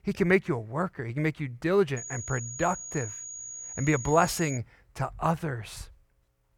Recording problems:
high-pitched whine; loud; from 2 to 4.5 s; 6.5 kHz, 9 dB below the speech

